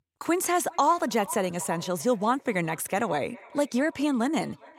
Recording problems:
echo of what is said; faint; throughout; 410 ms later, 20 dB below the speech

